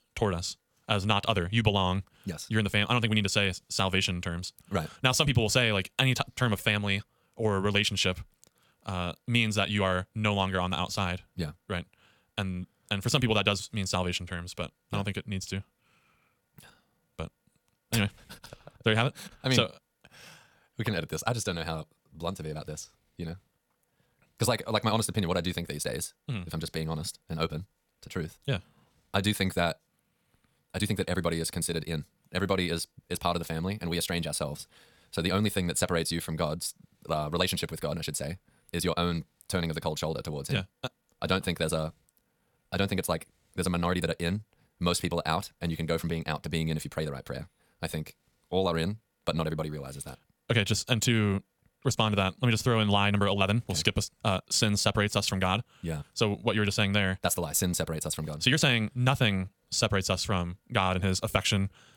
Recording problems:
wrong speed, natural pitch; too fast; 1.5 times normal speed

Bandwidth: 18.5 kHz